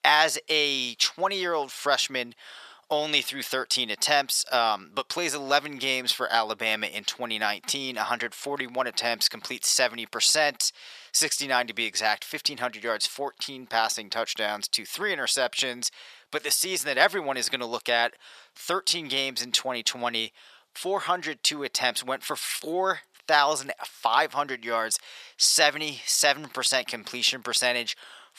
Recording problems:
thin; very; fading below 750 Hz

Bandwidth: 14.5 kHz